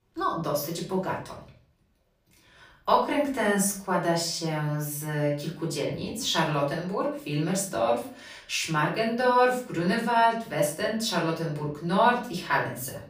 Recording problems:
off-mic speech; far
room echo; slight; dies away in 0.4 s

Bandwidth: 15 kHz